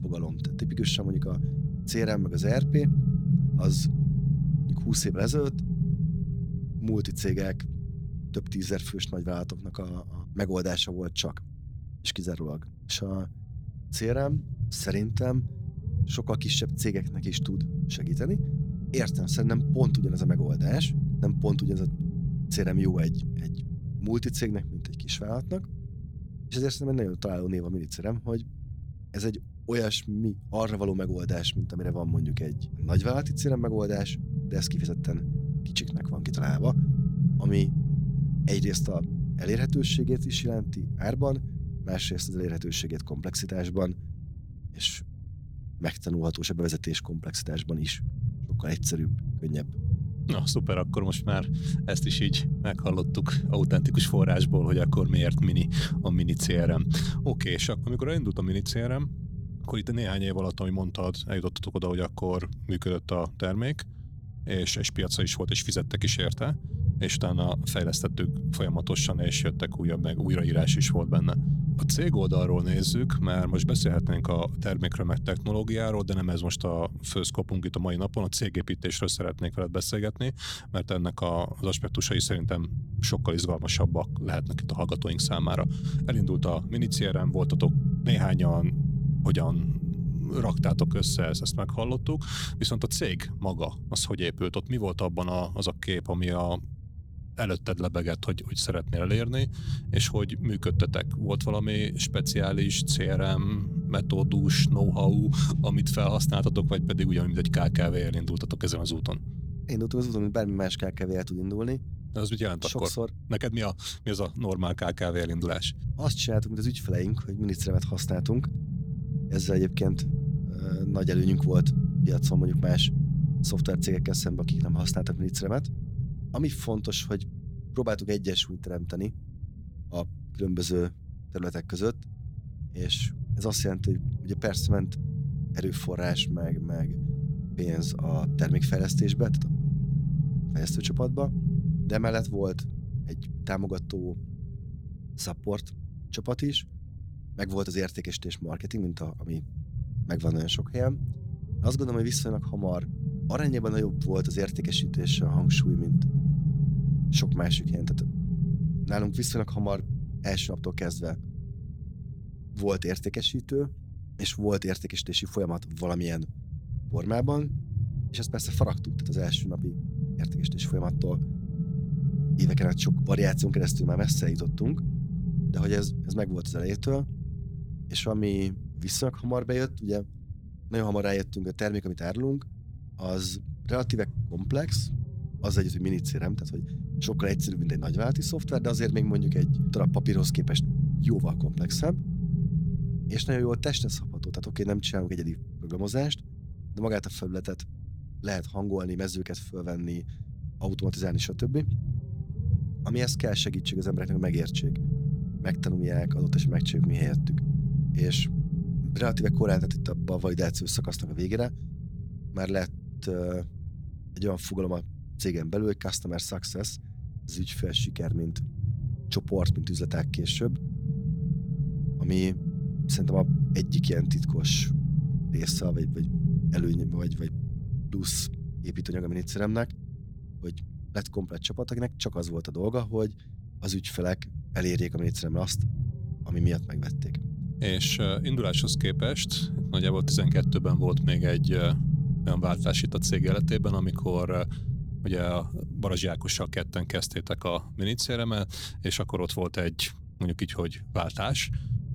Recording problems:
low rumble; loud; throughout; 7 dB below the speech

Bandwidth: 18 kHz